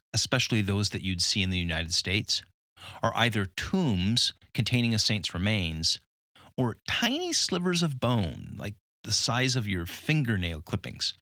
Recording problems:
garbled, watery; slightly

